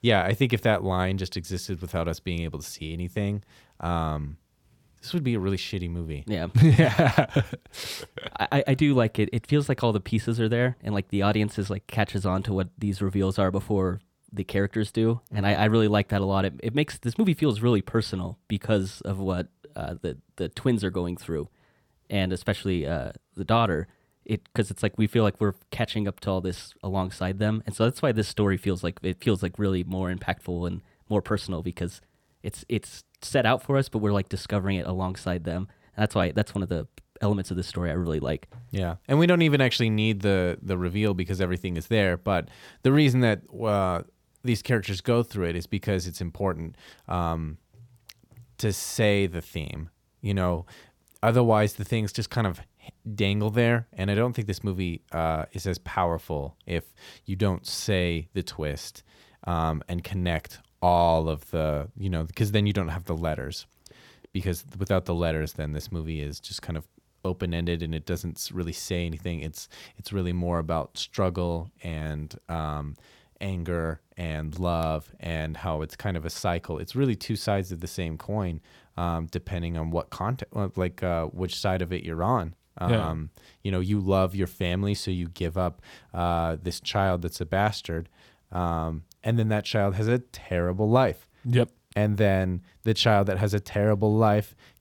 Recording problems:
none

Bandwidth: 18 kHz